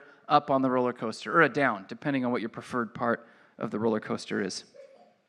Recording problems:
muffled; slightly; fading above 3 kHz

